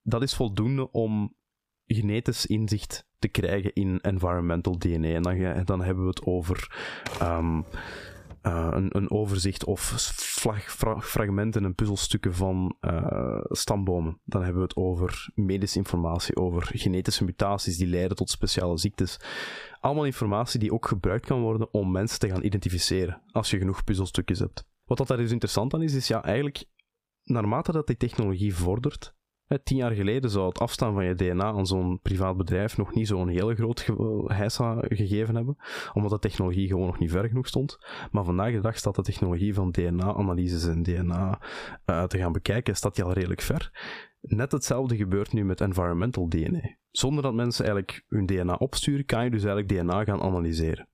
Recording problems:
squashed, flat; somewhat
keyboard typing; noticeable; from 7 to 8.5 s; peak 9 dB below the speech

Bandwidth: 15 kHz